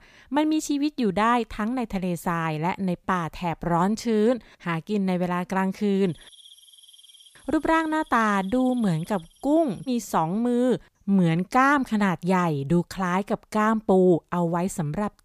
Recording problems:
none

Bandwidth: 15 kHz